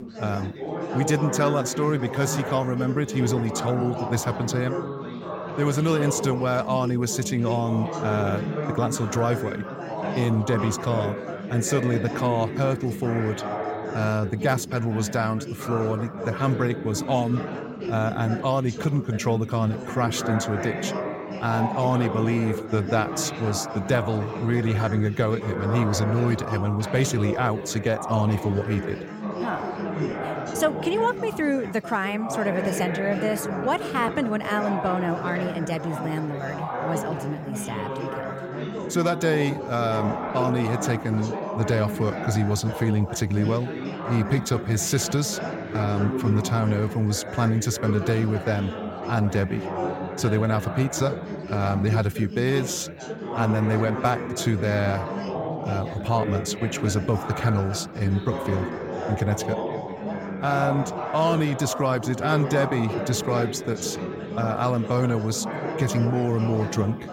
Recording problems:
background chatter; loud; throughout; 4 voices, 6 dB below the speech

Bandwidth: 16 kHz